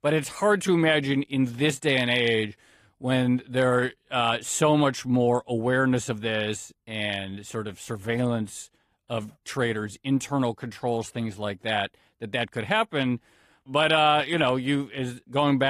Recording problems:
garbled, watery; slightly; nothing above 14.5 kHz
abrupt cut into speech; at the end

